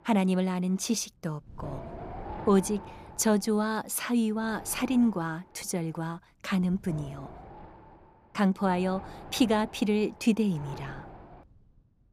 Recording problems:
wind noise on the microphone; occasional gusts; 15 dB below the speech

